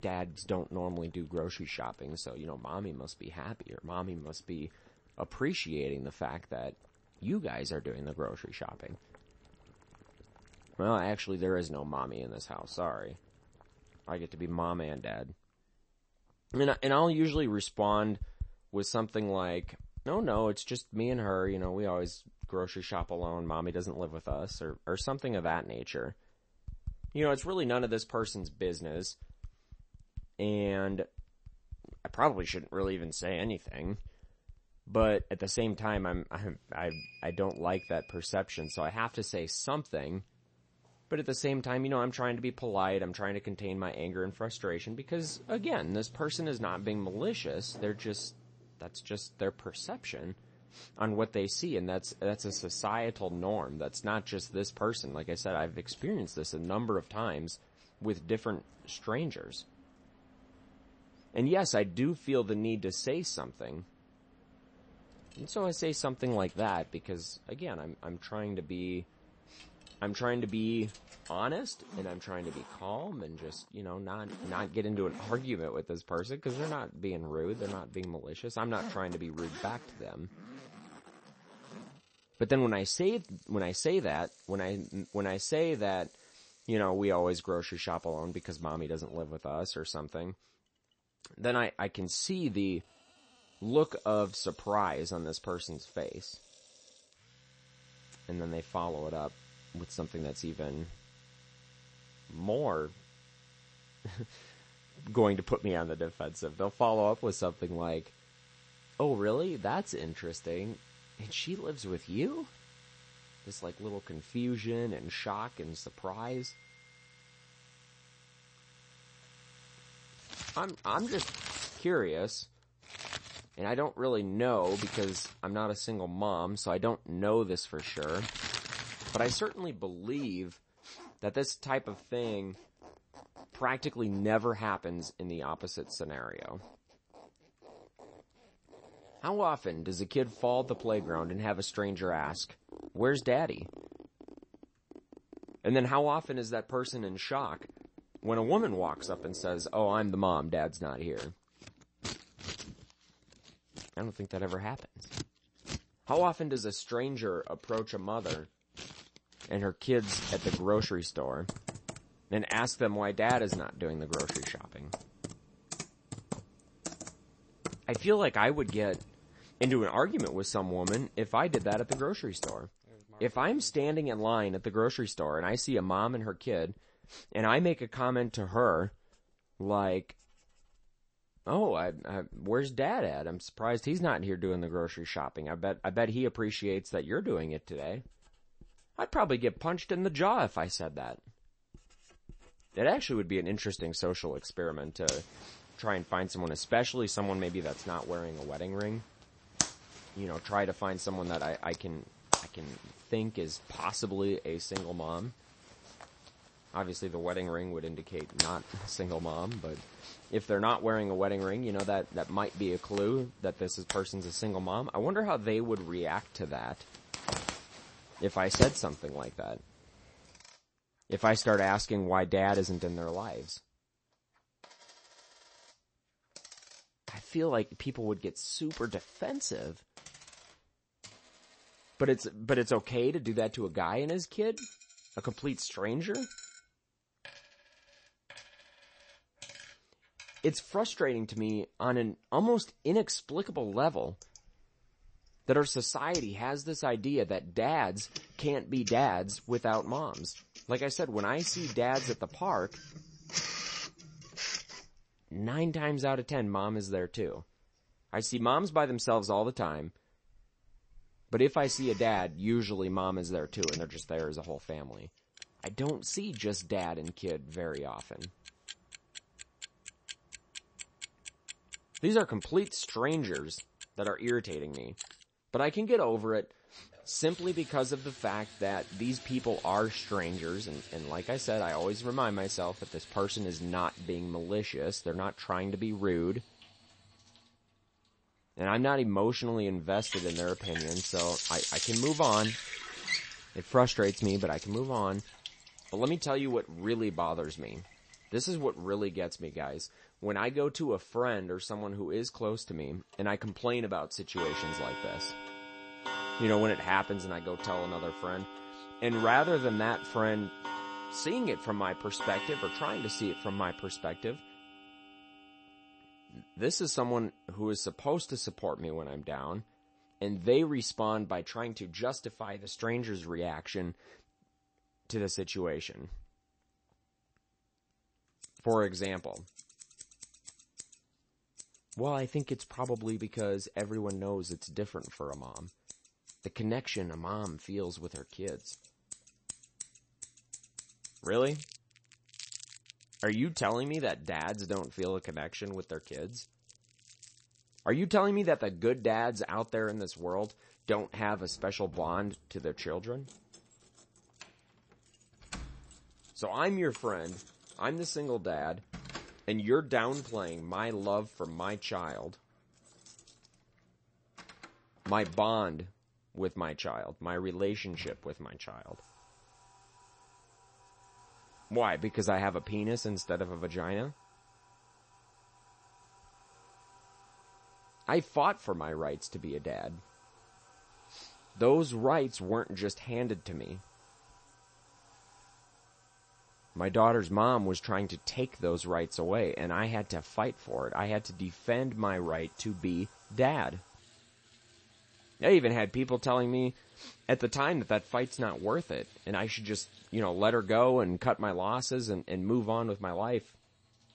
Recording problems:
garbled, watery; slightly; nothing above 8 kHz
household noises; noticeable; throughout; 10 dB below the speech

